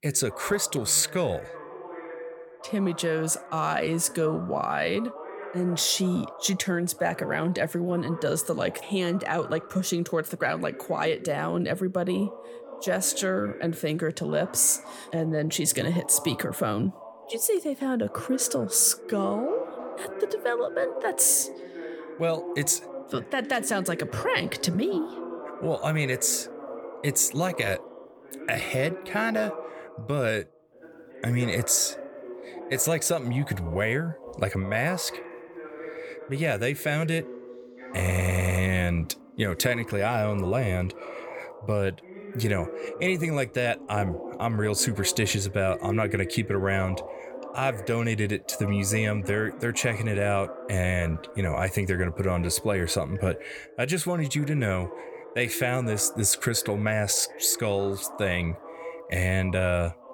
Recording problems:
voice in the background; noticeable; throughout; 15 dB below the speech
audio stuttering; at 38 s

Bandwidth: 17.5 kHz